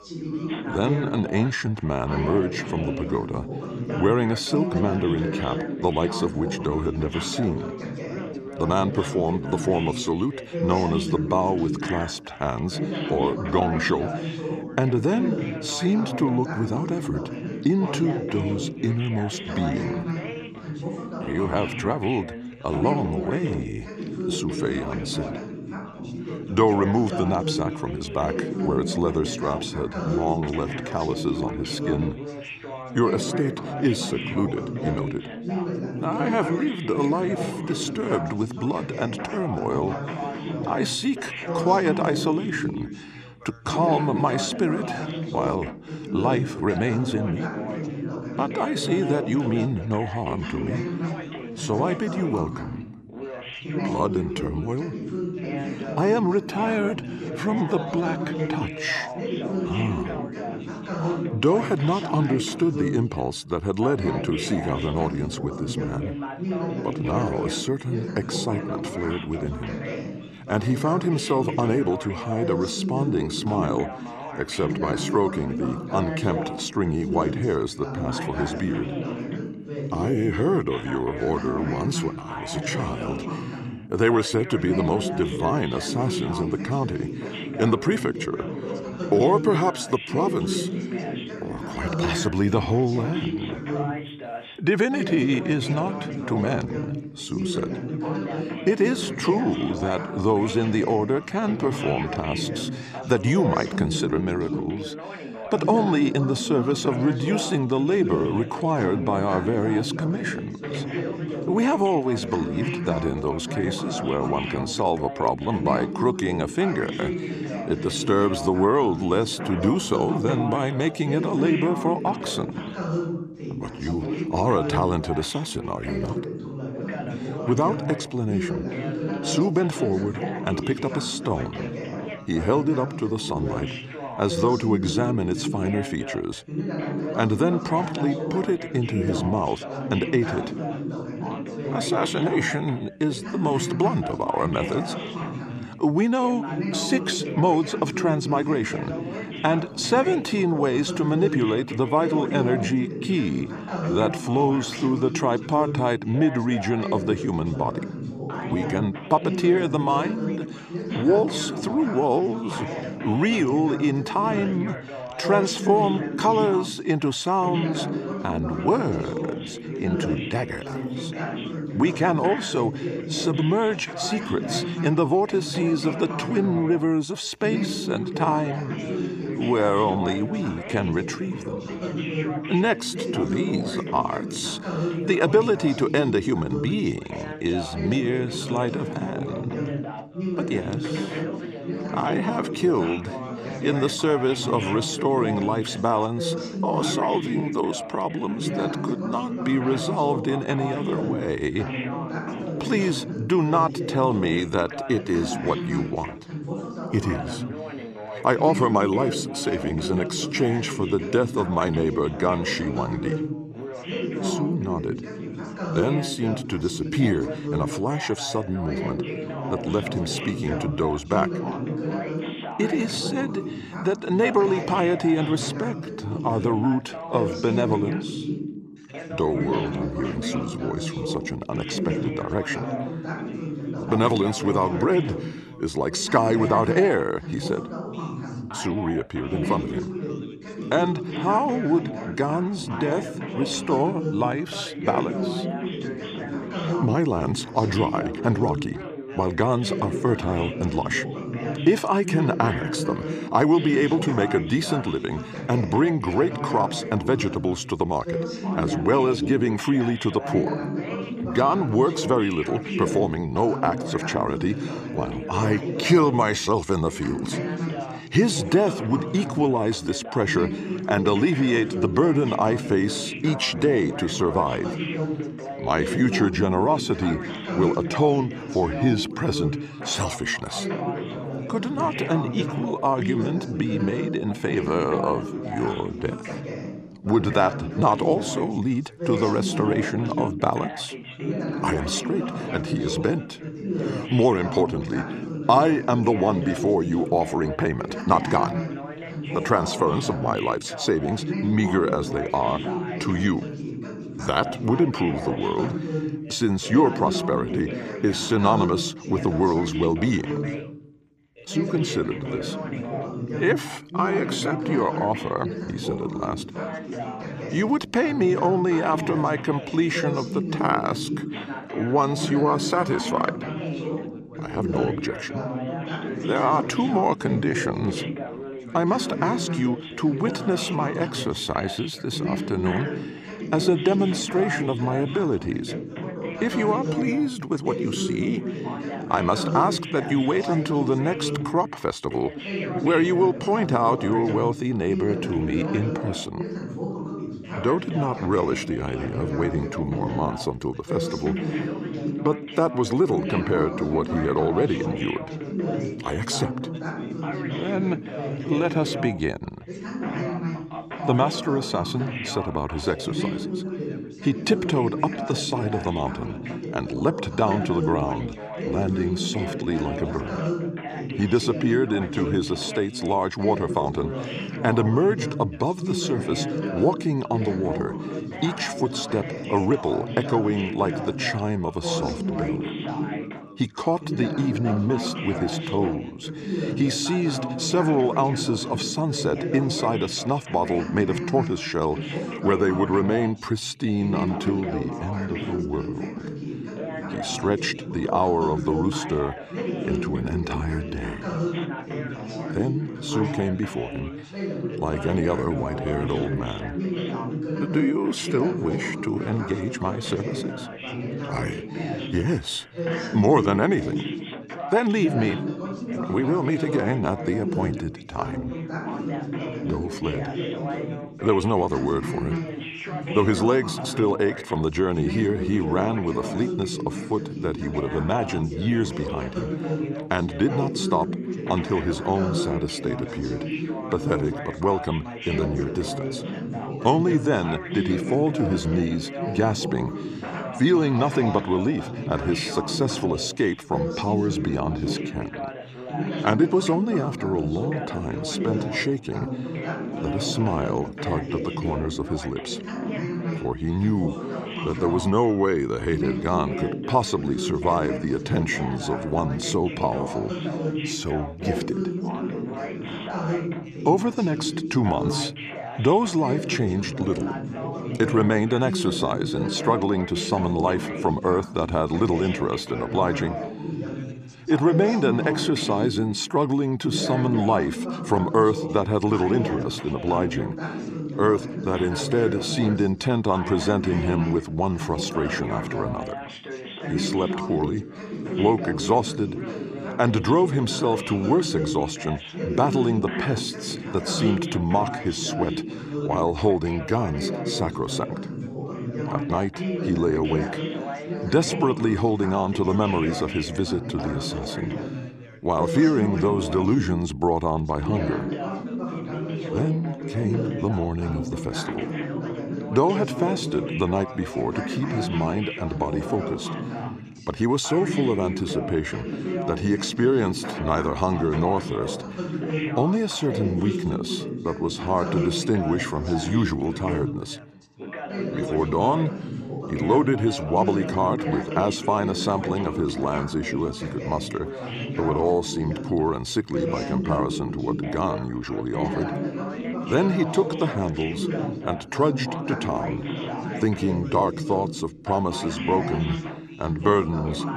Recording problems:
background chatter; loud; throughout; 3 voices, 6 dB below the speech

